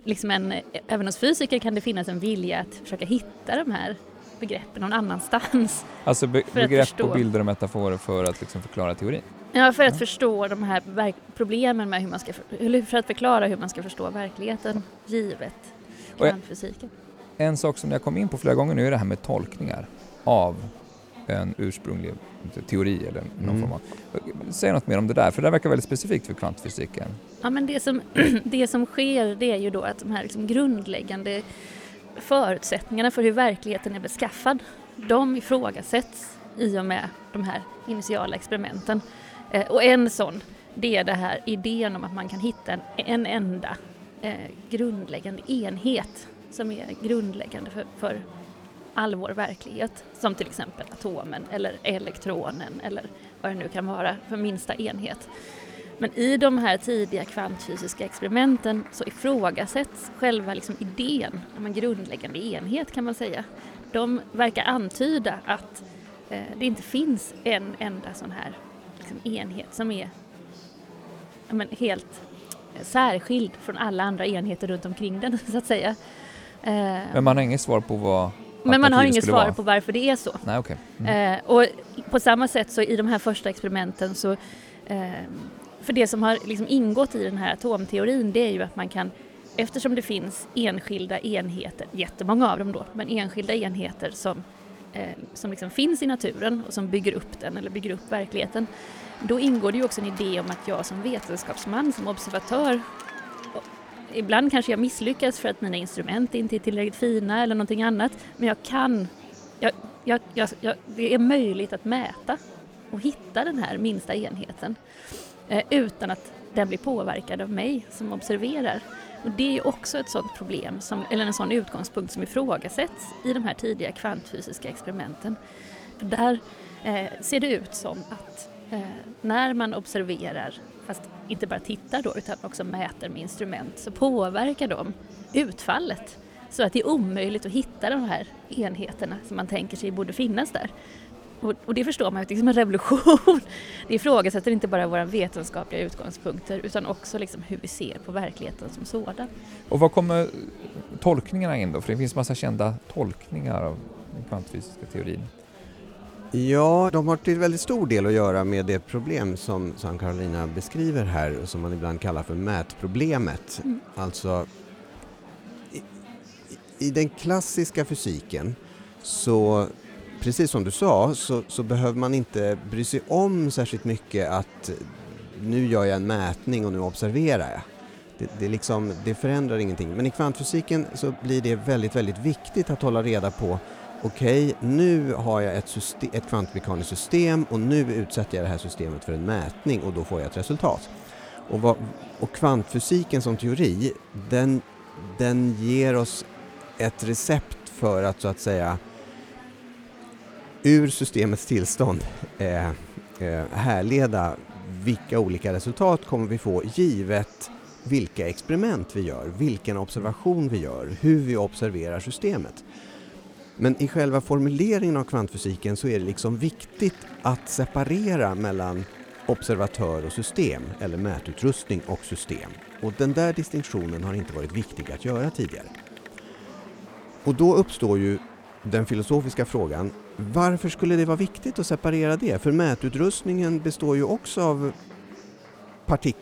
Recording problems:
murmuring crowd; noticeable; throughout; 20 dB below the speech

